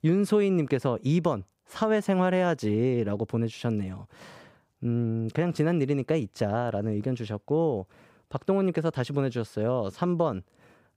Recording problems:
none

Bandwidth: 15.5 kHz